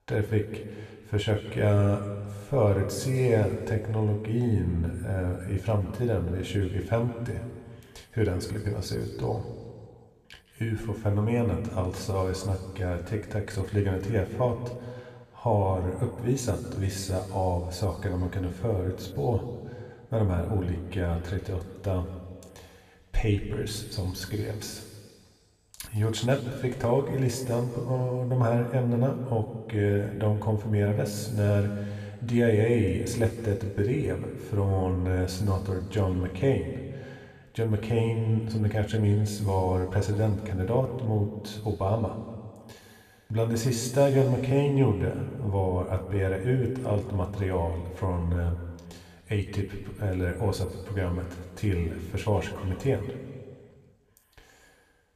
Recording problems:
room echo; noticeable; dies away in 1.8 s
off-mic speech; somewhat distant

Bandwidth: 14.5 kHz